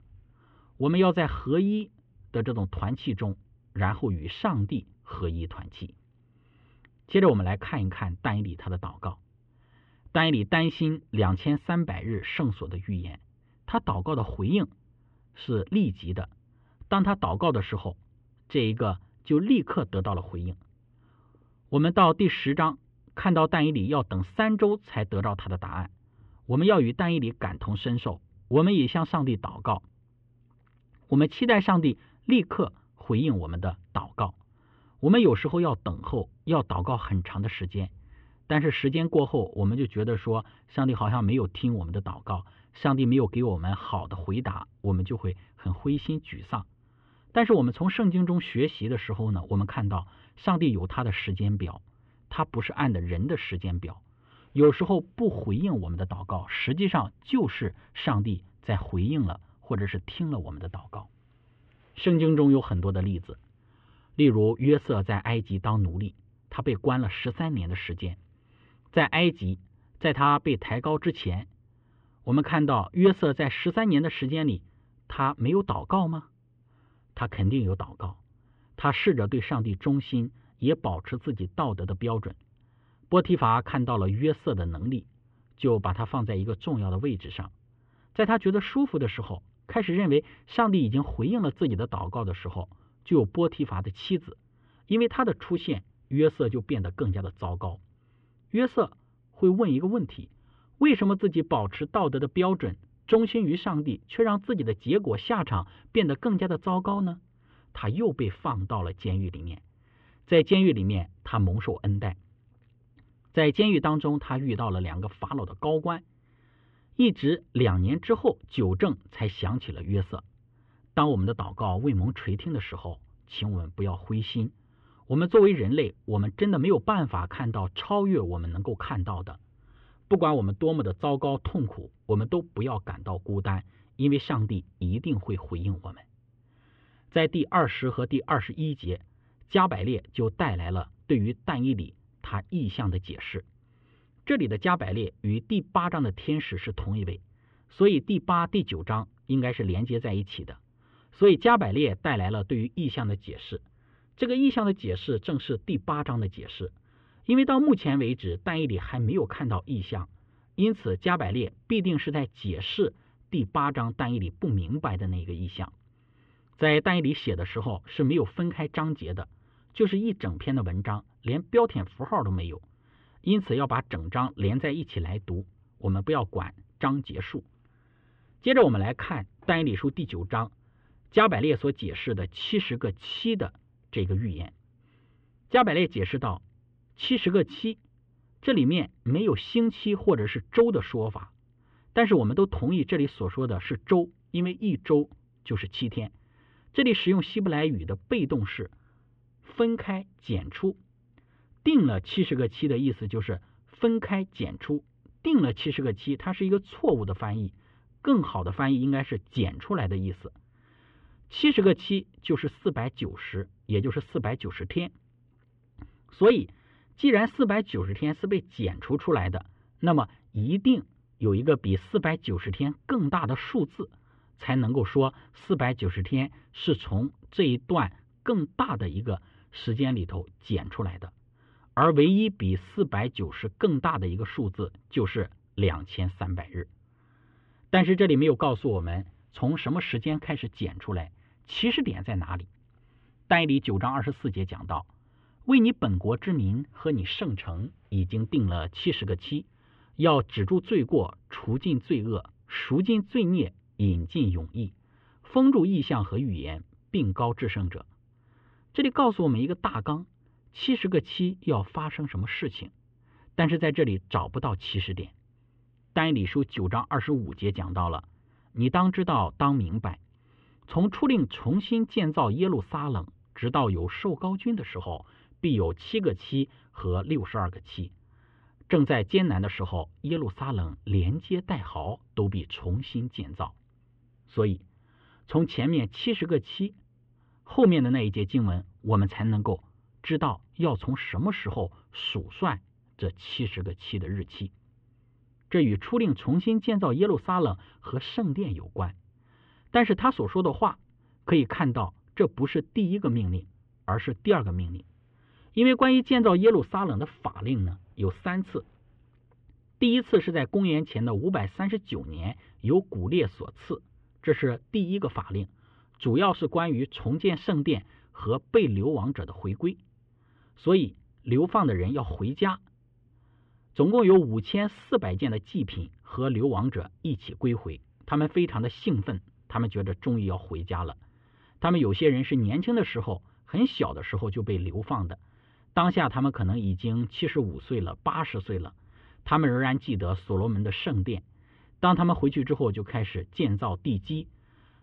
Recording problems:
muffled; very; fading above 3 kHz

